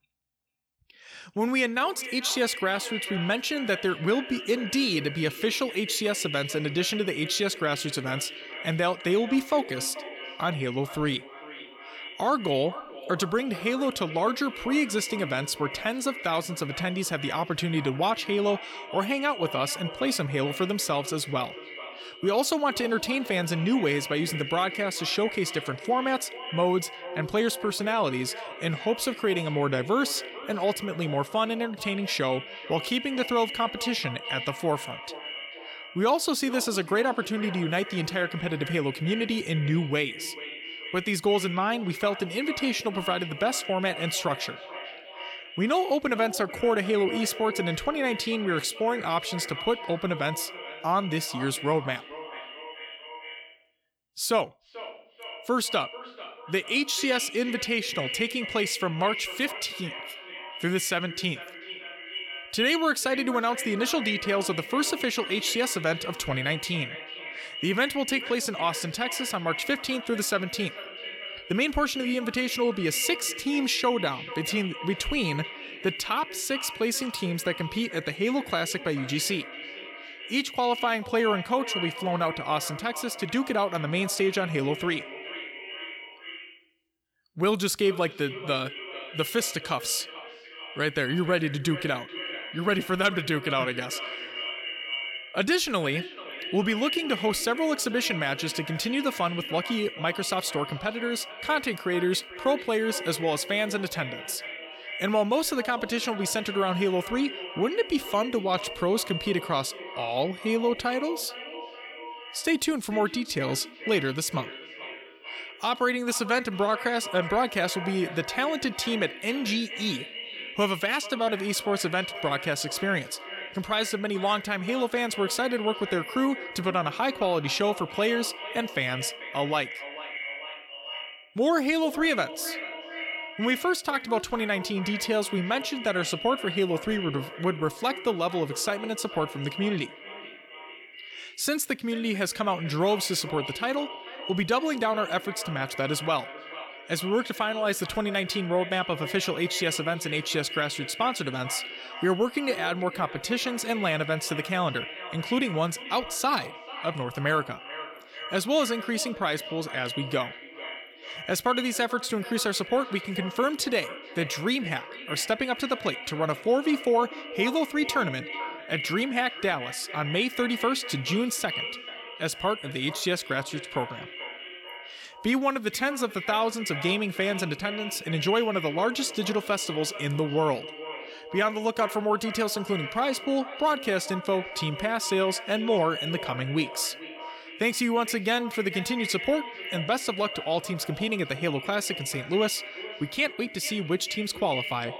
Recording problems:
echo of what is said; strong; throughout; 440 ms later, 9 dB below the speech

